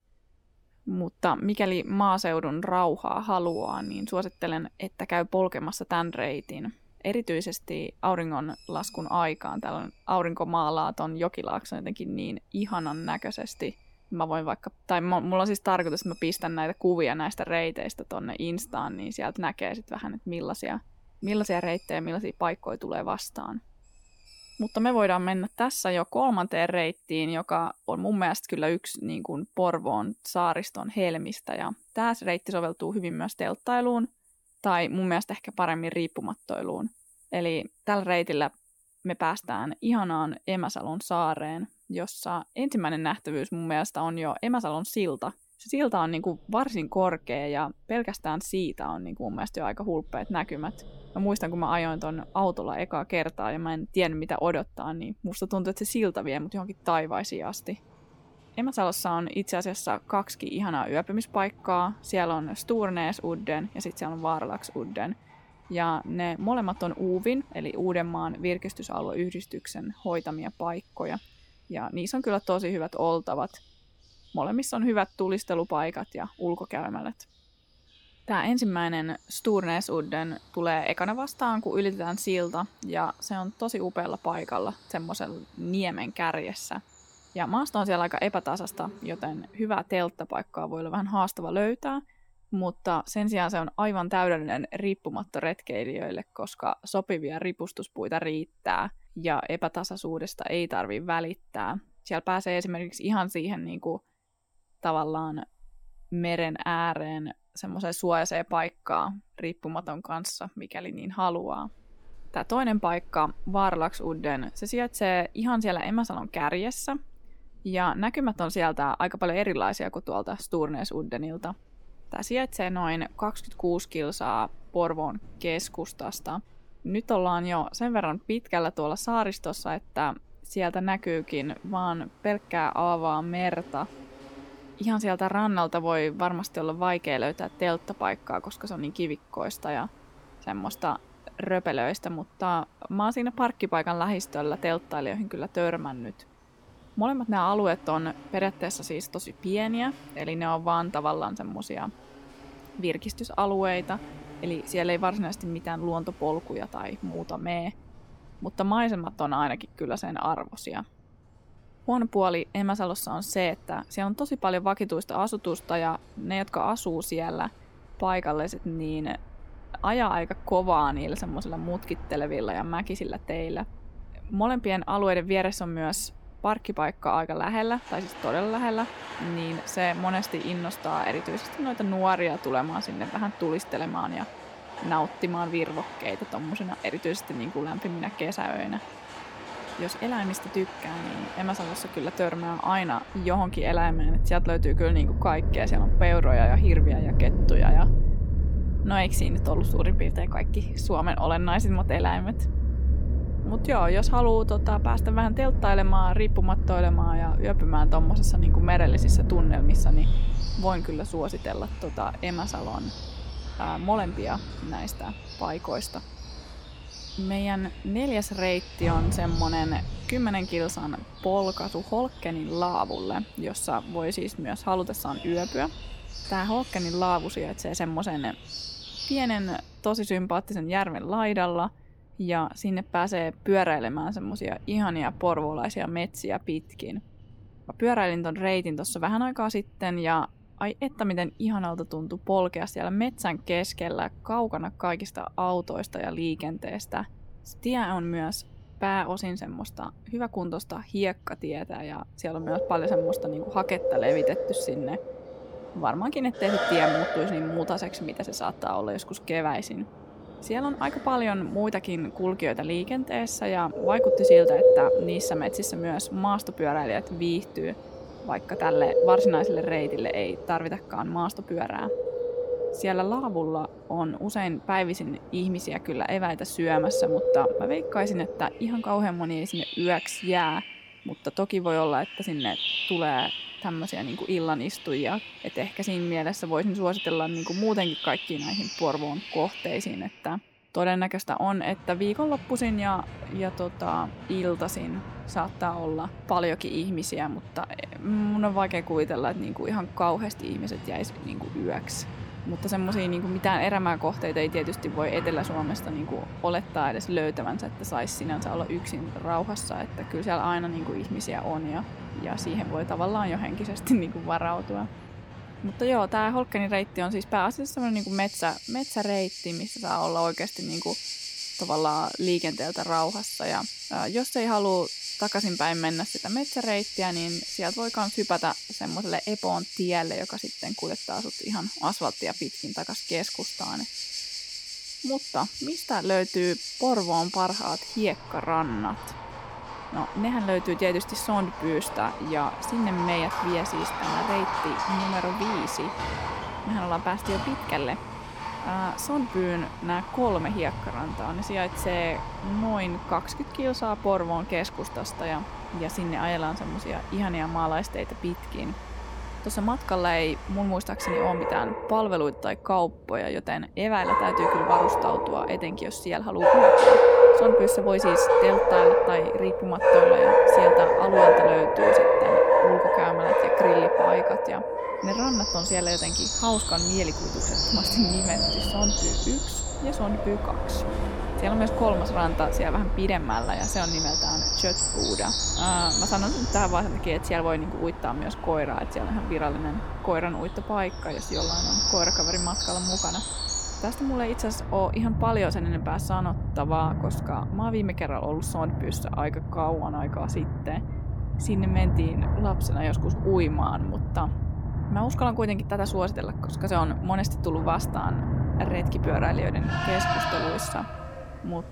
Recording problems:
animal sounds; very loud; throughout; 2 dB above the speech

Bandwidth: 17.5 kHz